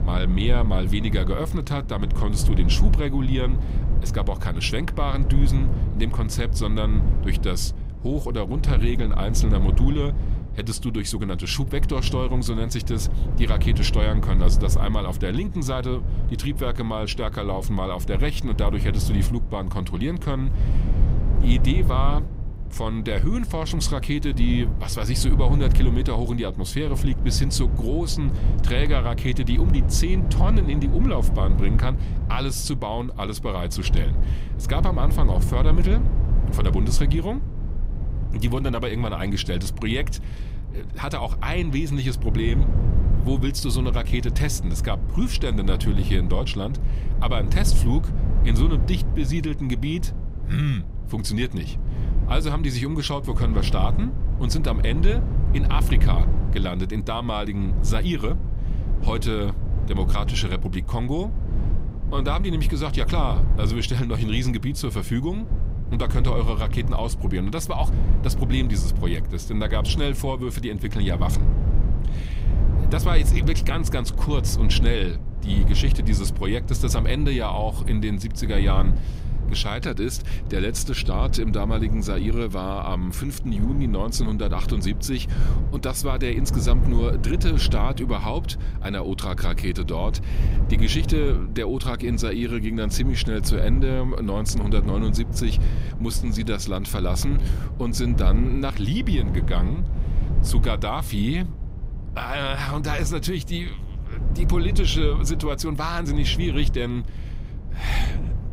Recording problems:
low rumble; noticeable; throughout; 10 dB below the speech

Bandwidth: 15.5 kHz